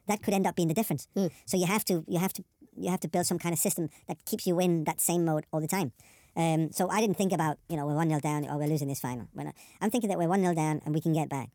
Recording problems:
wrong speed and pitch; too fast and too high; 1.5 times normal speed

